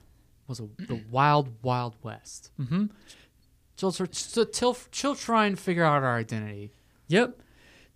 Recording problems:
none

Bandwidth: 15 kHz